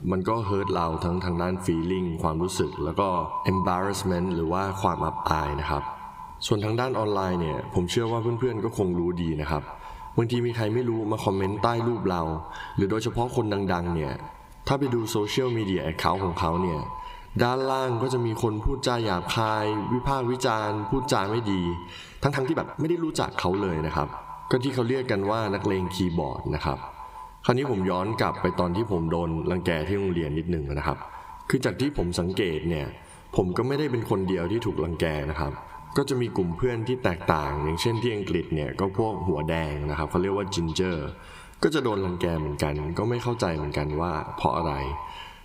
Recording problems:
echo of what is said; noticeable; throughout; 160 ms later, 10 dB below the speech
squashed, flat; somewhat
uneven, jittery; strongly; from 3.5 to 31 s

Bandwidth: 15.5 kHz